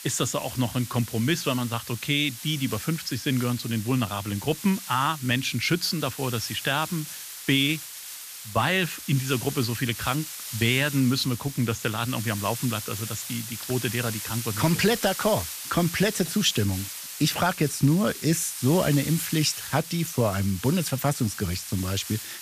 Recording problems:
hiss; loud; throughout; 9 dB below the speech

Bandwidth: 14.5 kHz